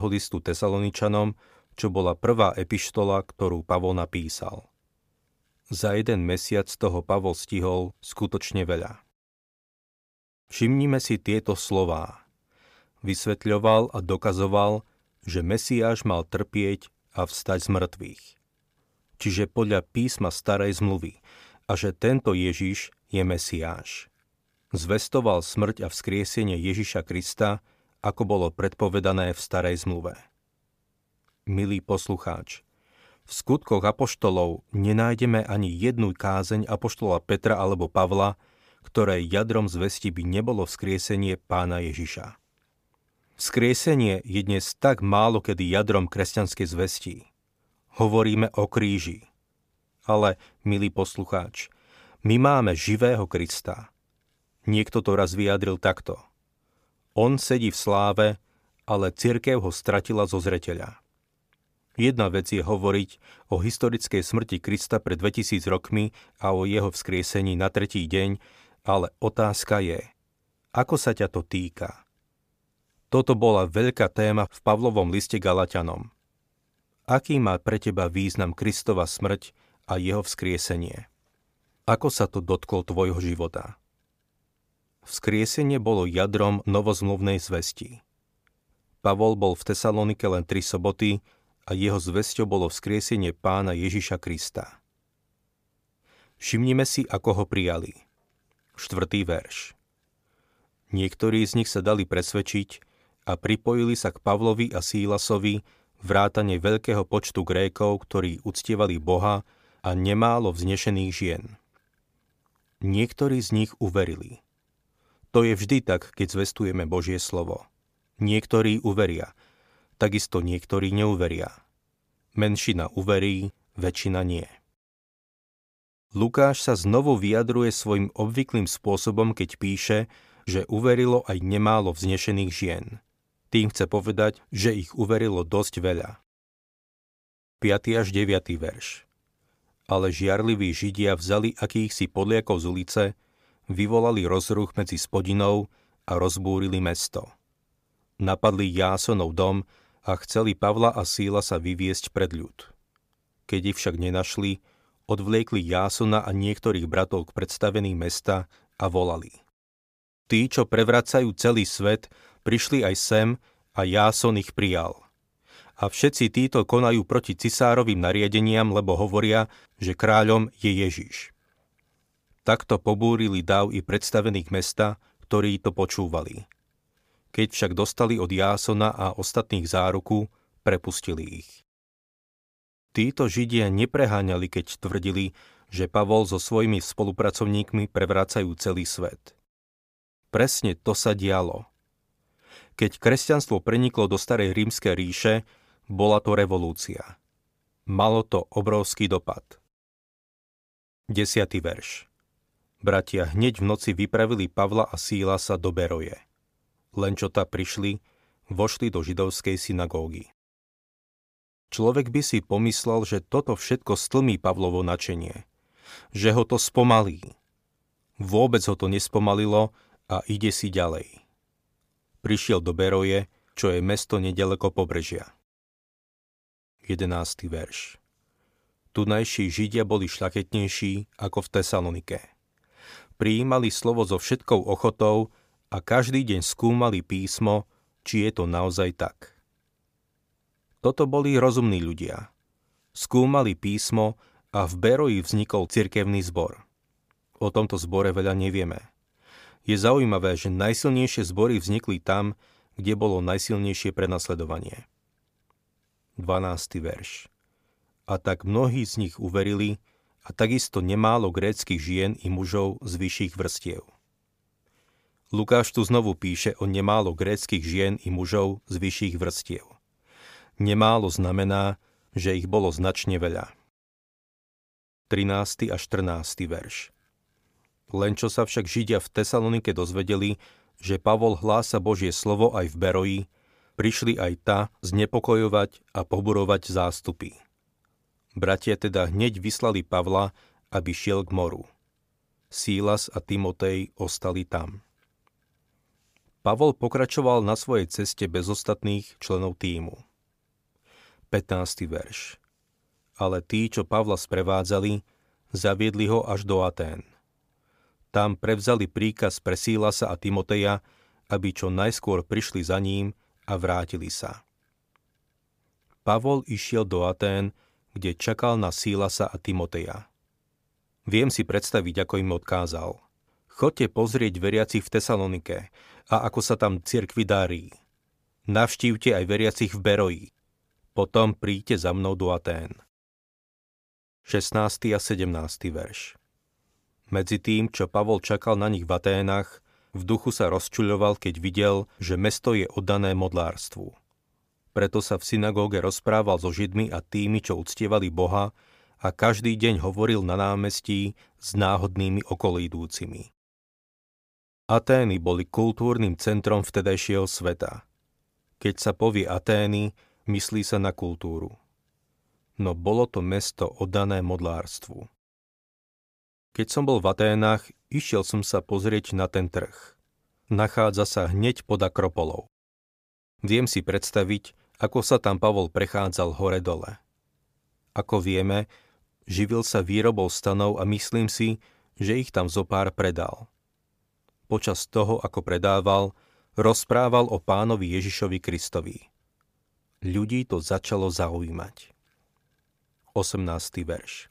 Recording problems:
abrupt cut into speech; at the start

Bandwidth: 15 kHz